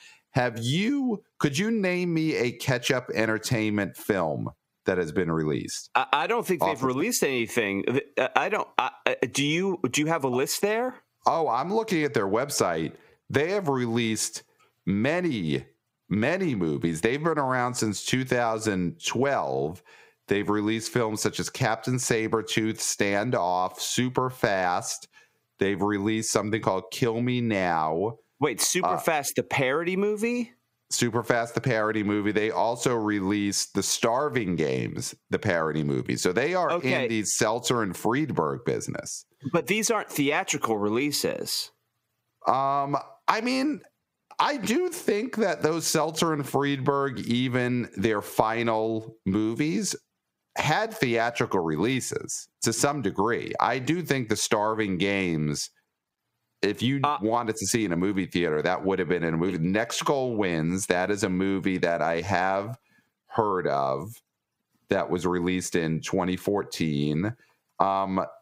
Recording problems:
squashed, flat; heavily

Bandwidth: 15.5 kHz